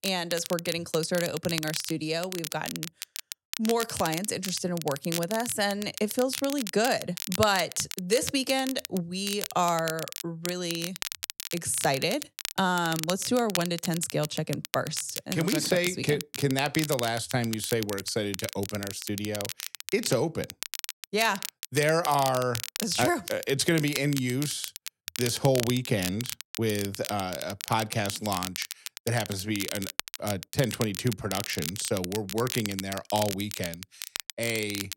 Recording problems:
crackle, like an old record; loud; 7 dB below the speech

